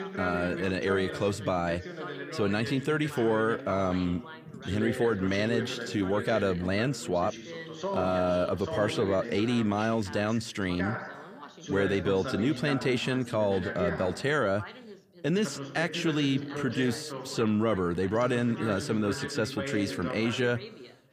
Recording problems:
background chatter; loud; throughout; 2 voices, 9 dB below the speech

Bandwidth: 15 kHz